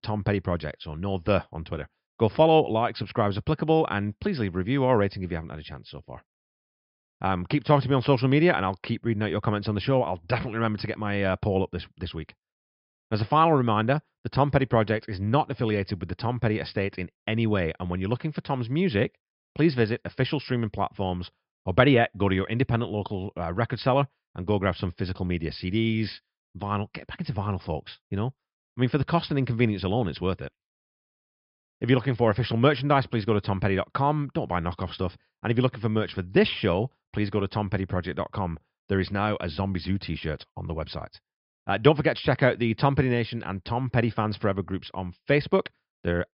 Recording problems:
high frequencies cut off; noticeable; nothing above 5.5 kHz

